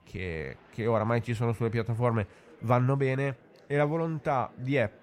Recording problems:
murmuring crowd; faint; throughout; 25 dB below the speech

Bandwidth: 16 kHz